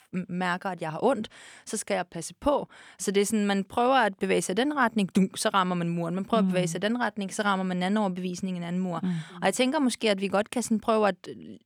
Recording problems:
none

